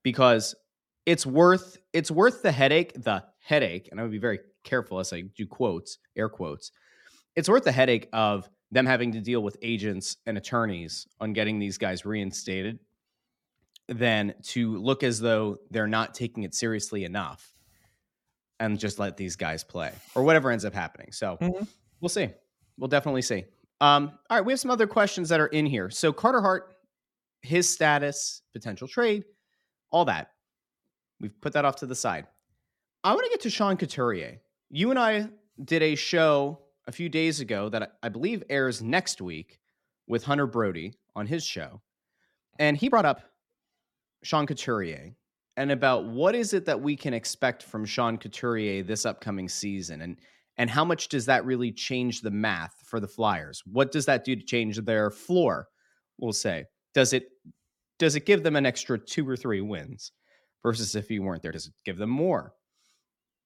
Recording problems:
uneven, jittery; strongly; from 8.5 s to 1:02

